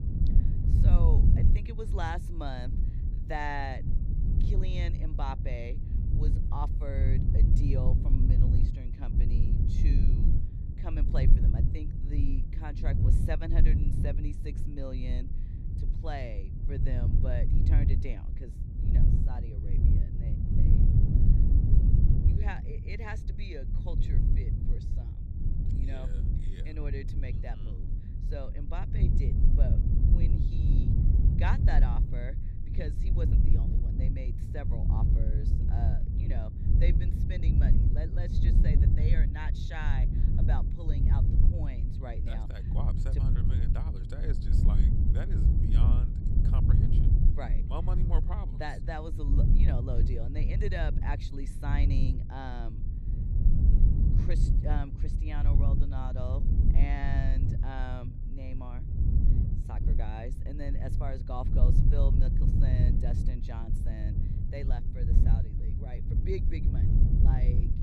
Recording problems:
low rumble; loud; throughout; 2 dB below the speech

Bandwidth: 14 kHz